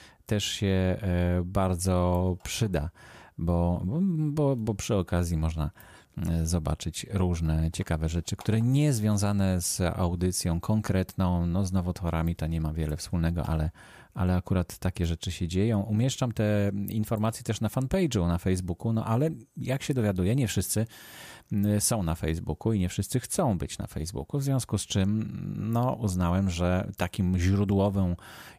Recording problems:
none

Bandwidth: 15 kHz